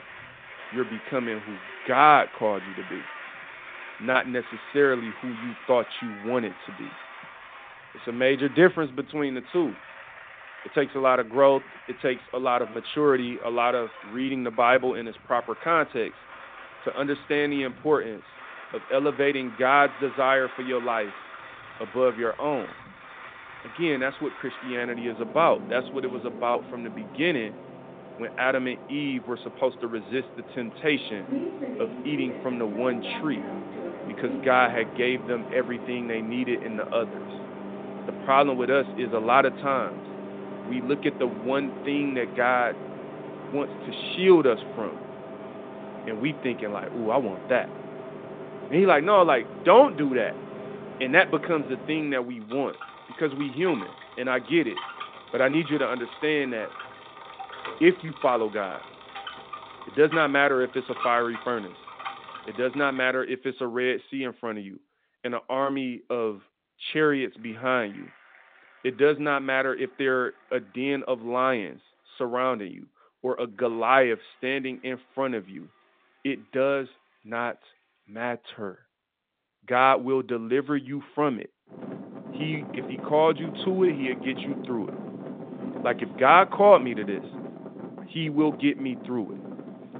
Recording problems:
phone-call audio; nothing above 3.5 kHz
traffic noise; noticeable; throughout; 15 dB below the speech

